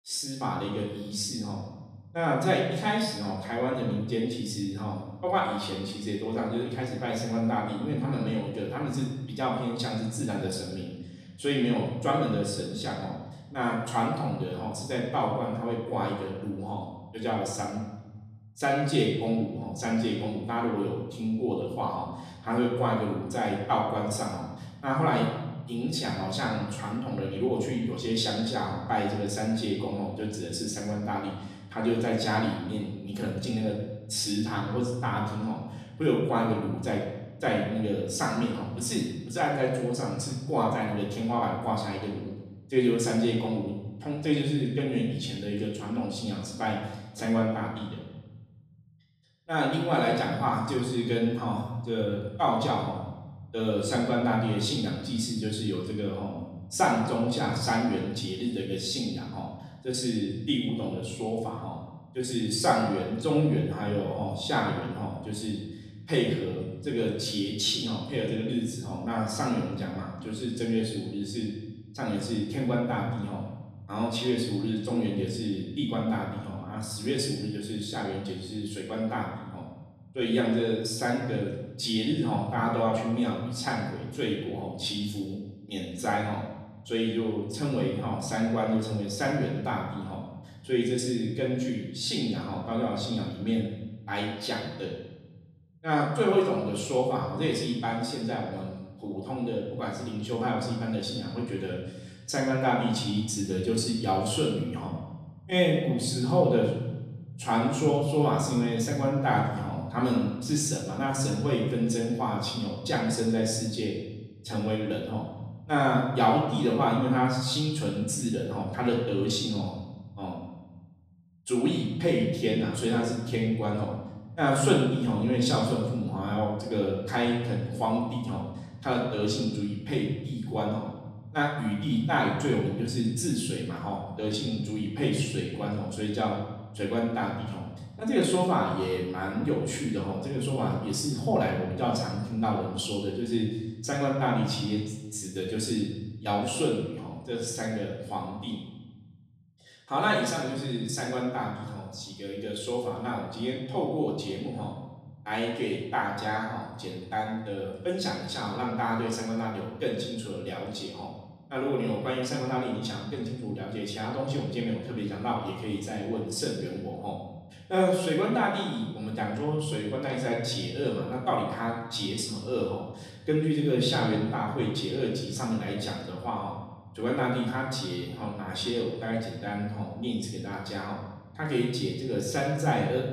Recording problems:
off-mic speech; far
room echo; noticeable; dies away in 1.3 s

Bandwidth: 15 kHz